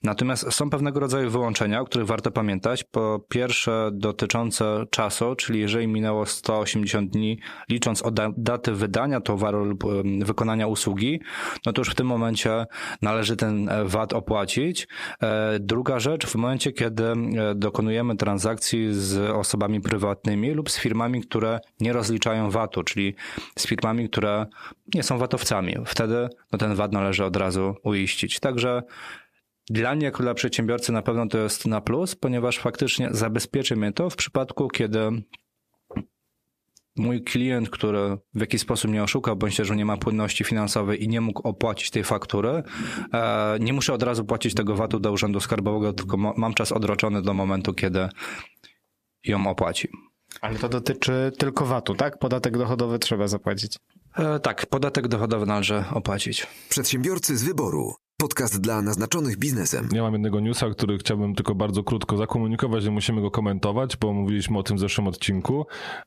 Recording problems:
squashed, flat; heavily

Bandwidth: 14.5 kHz